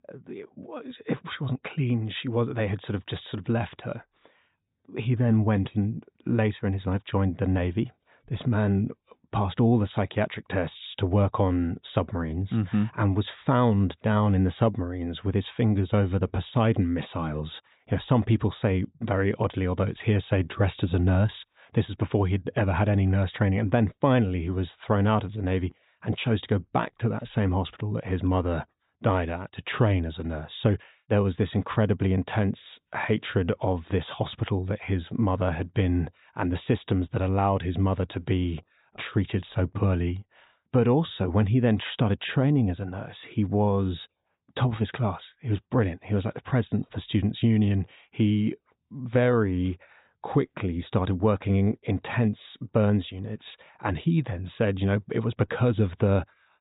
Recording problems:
high frequencies cut off; severe; nothing above 4 kHz

